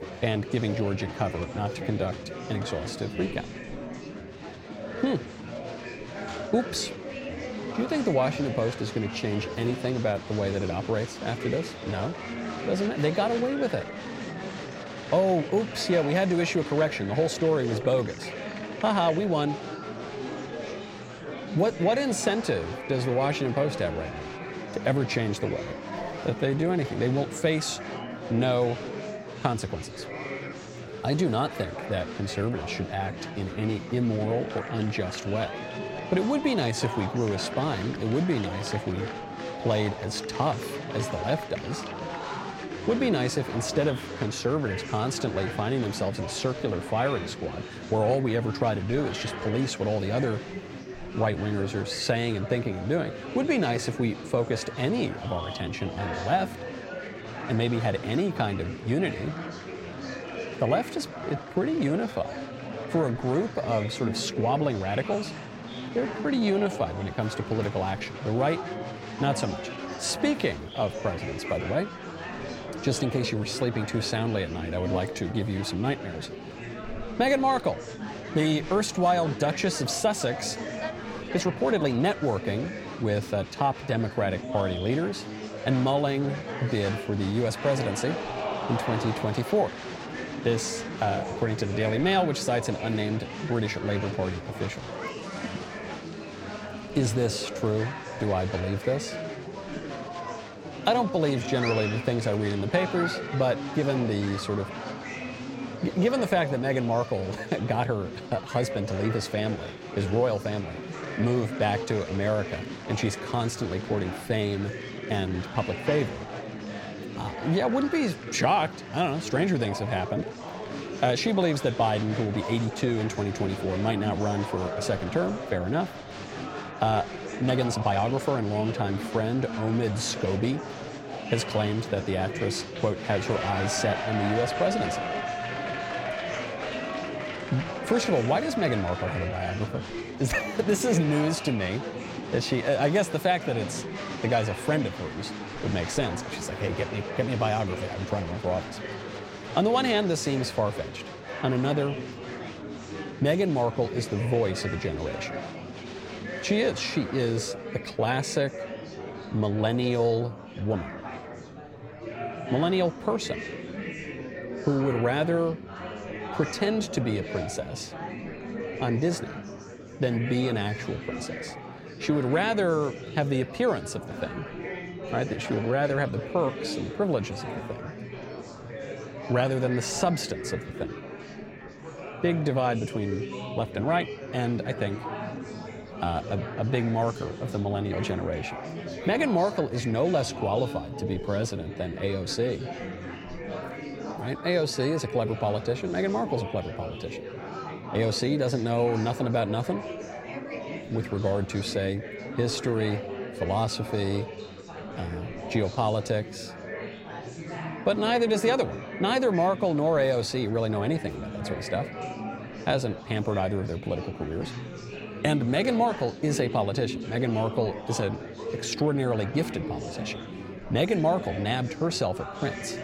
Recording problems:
murmuring crowd; loud; throughout; 8 dB below the speech
uneven, jittery; strongly; from 26 s to 3:28

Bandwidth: 16.5 kHz